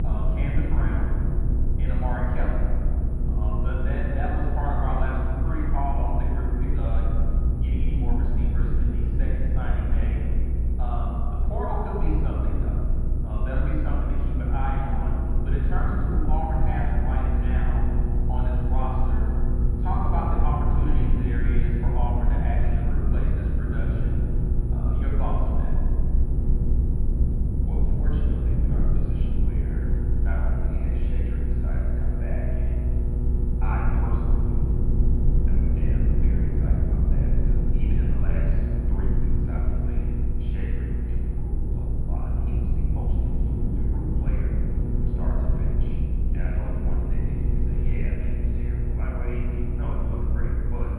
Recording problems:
room echo; strong; dies away in 2.5 s
off-mic speech; far
muffled; very; fading above 2.5 kHz
electrical hum; loud; throughout; 60 Hz, 7 dB below the speech
low rumble; loud; throughout; 5 dB below the speech
high-pitched whine; faint; throughout; 10 kHz, 35 dB below the speech

